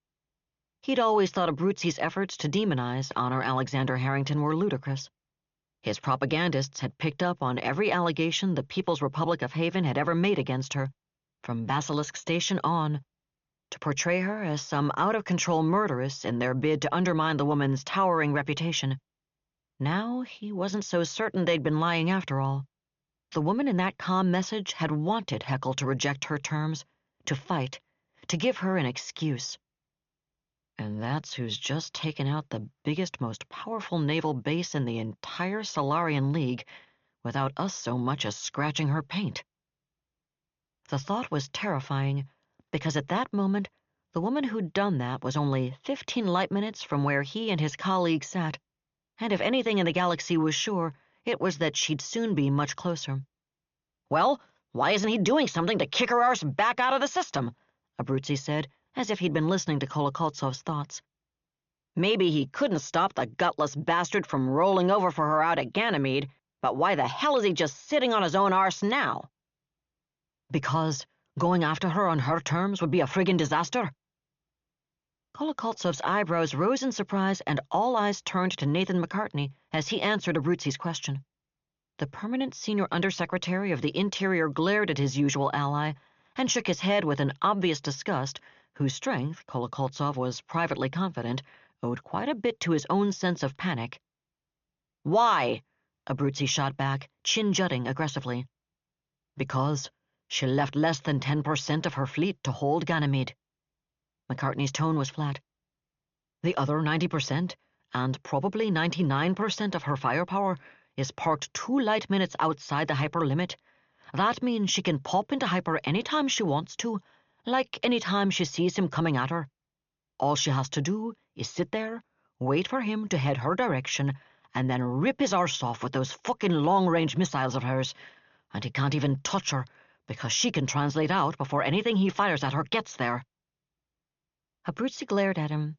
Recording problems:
high frequencies cut off; noticeable; nothing above 7 kHz

